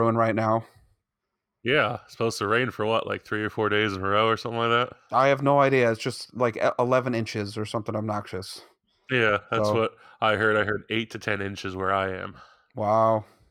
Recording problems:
abrupt cut into speech; at the start

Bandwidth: 18 kHz